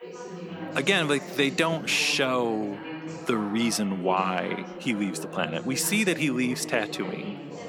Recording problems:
background chatter; noticeable; throughout; 3 voices, 10 dB below the speech

